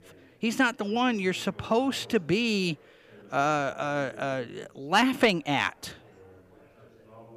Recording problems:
background chatter; faint; throughout; 4 voices, 25 dB below the speech

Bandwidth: 15 kHz